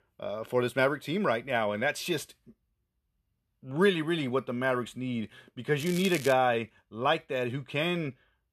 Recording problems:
crackling; noticeable; at 6 s; 10 dB below the speech

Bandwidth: 13.5 kHz